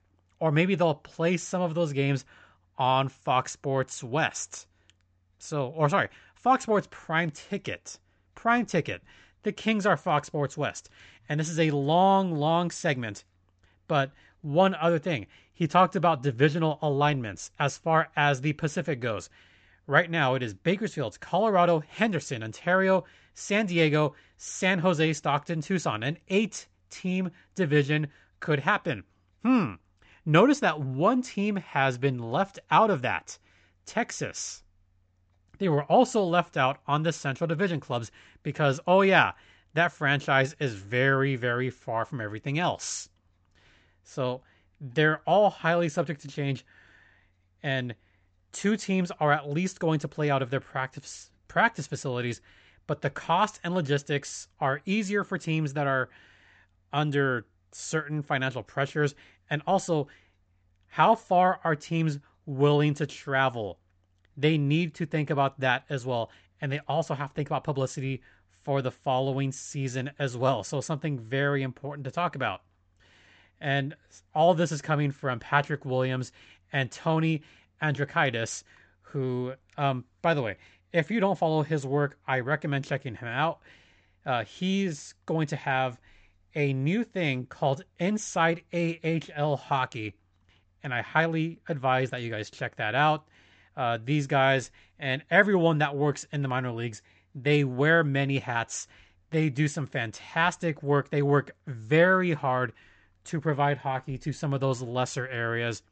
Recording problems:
high frequencies cut off; noticeable; nothing above 8 kHz

